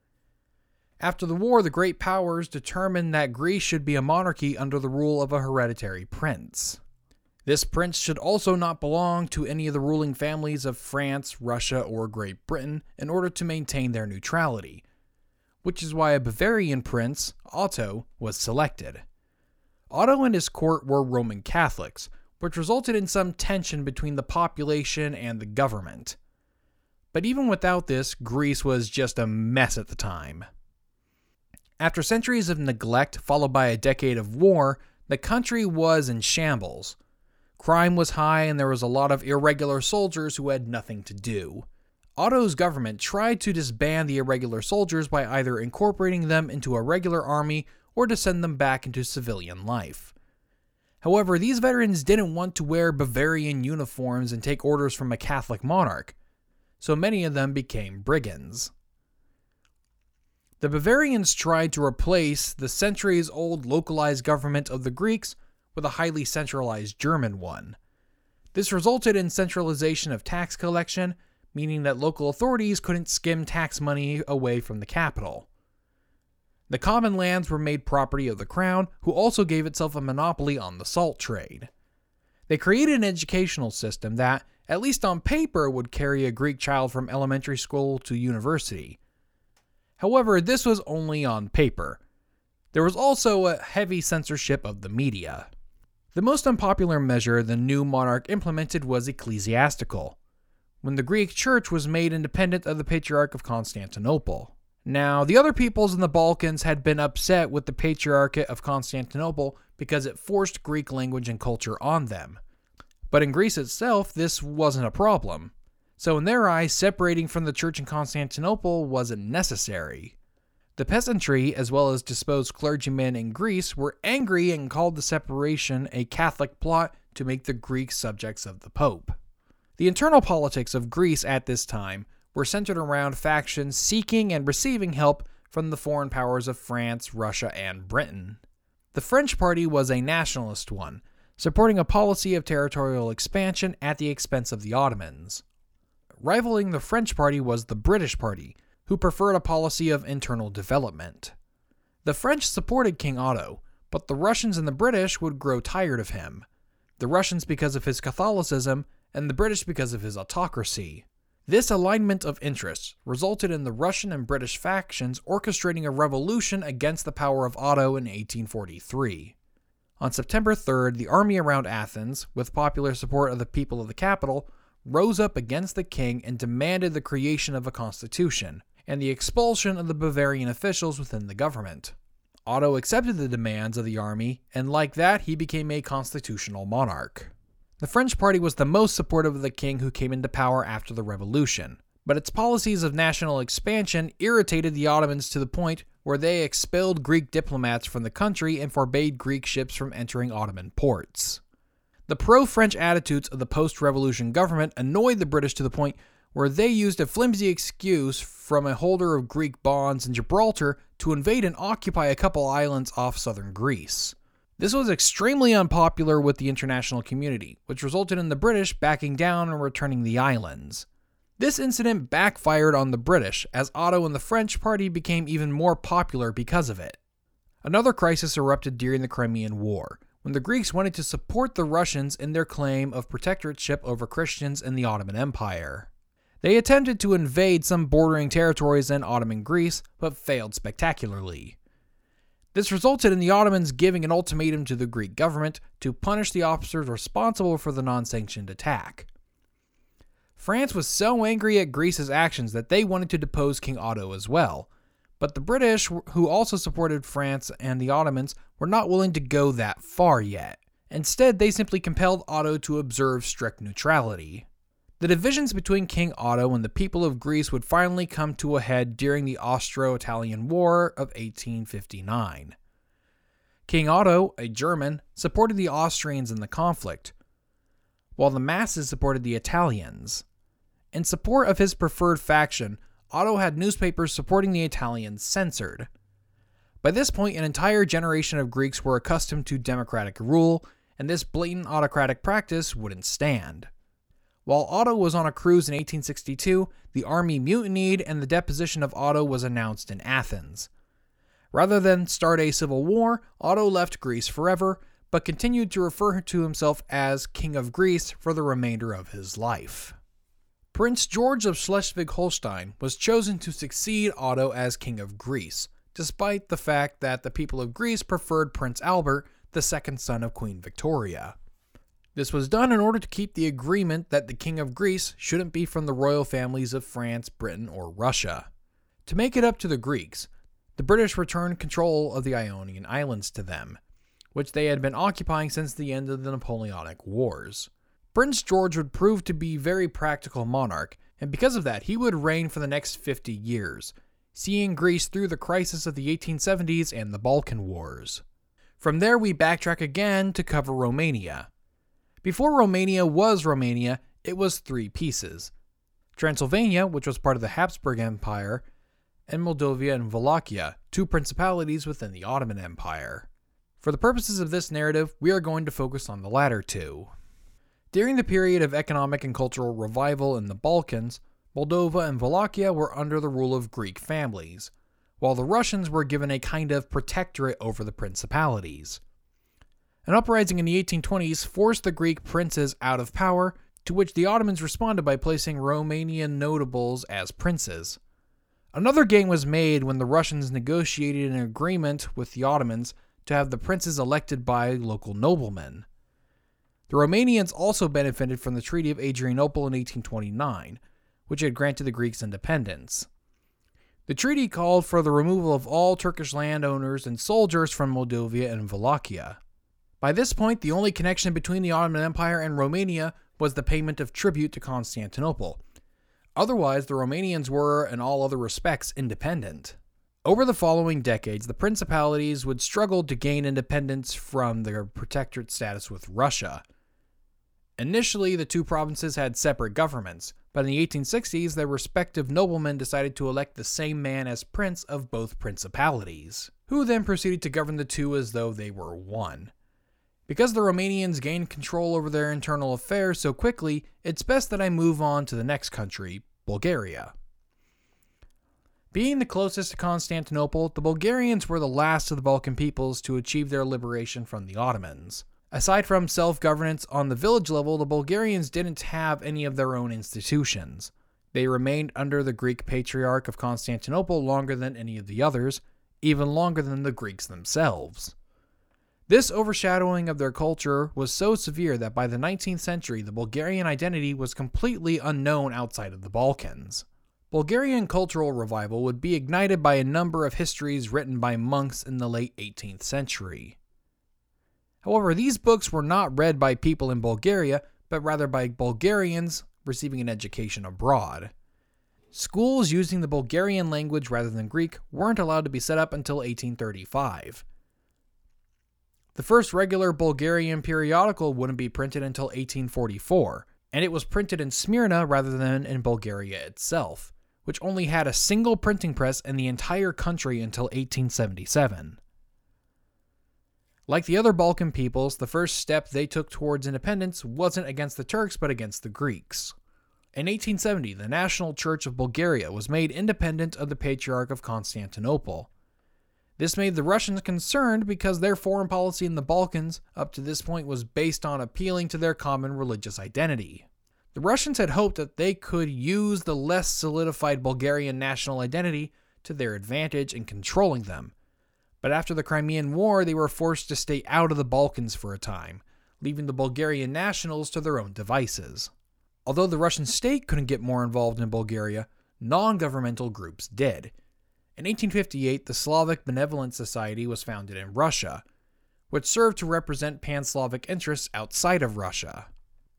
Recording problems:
none

